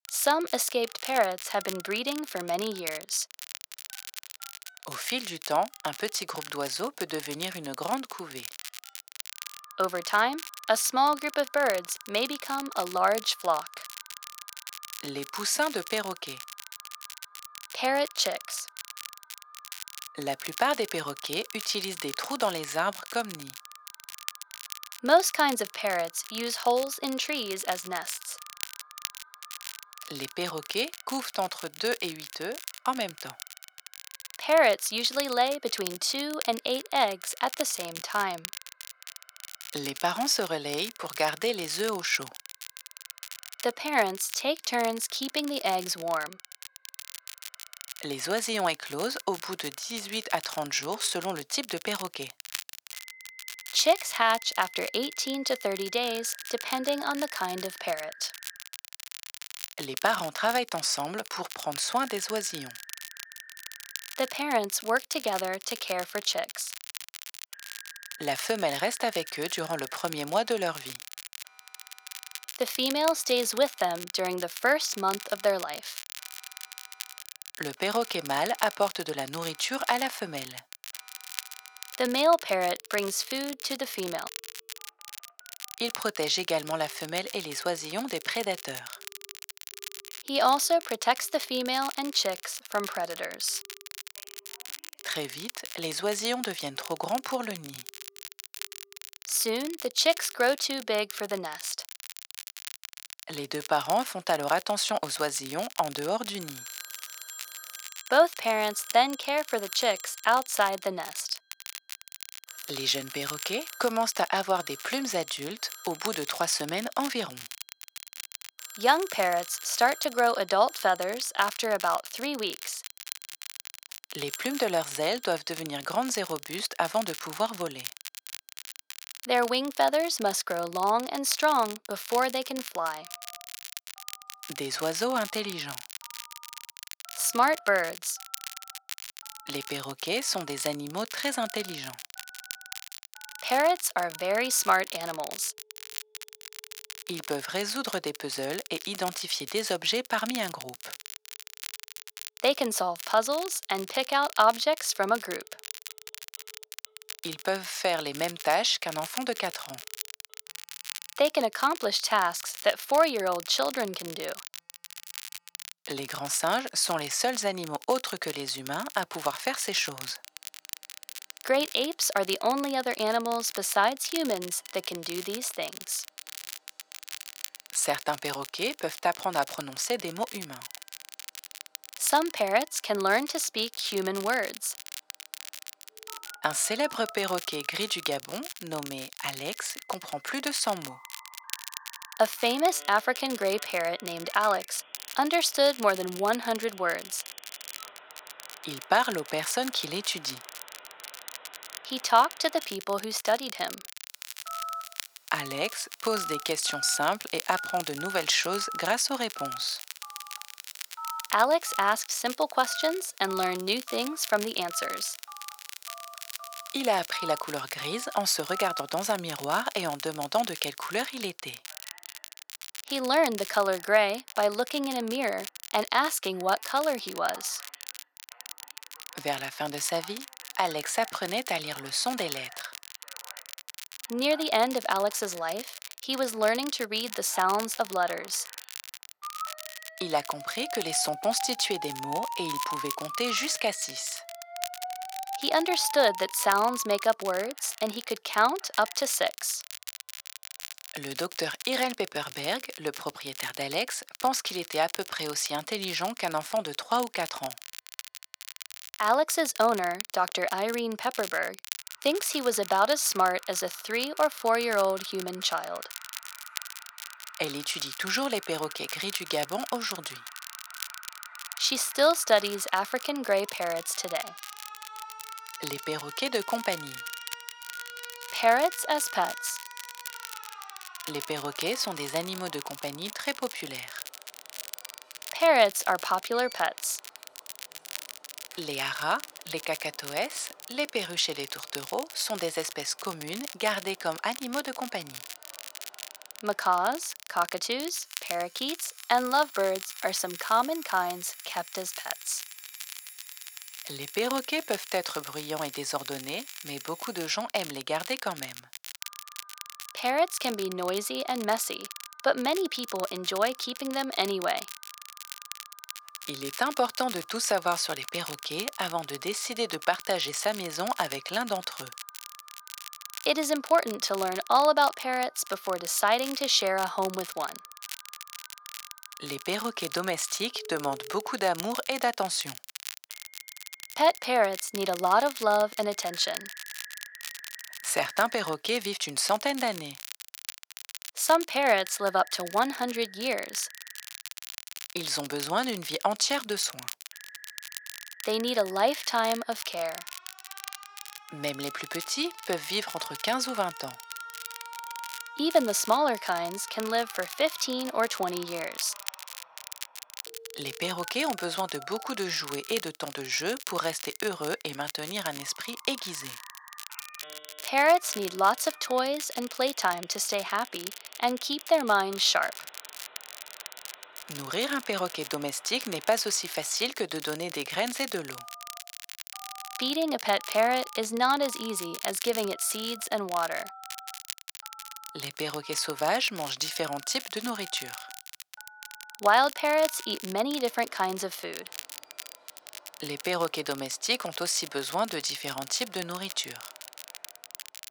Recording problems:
thin; very; fading below 550 Hz
alarms or sirens; noticeable; throughout; 20 dB below the speech
crackle, like an old record; noticeable; 10 dB below the speech

